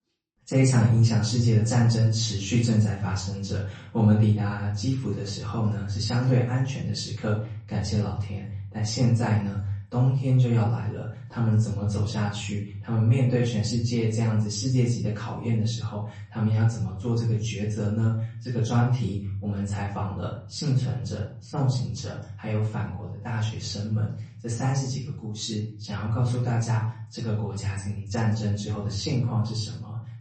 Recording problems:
off-mic speech; far
room echo; noticeable; dies away in 0.5 s
garbled, watery; slightly; nothing above 8 kHz

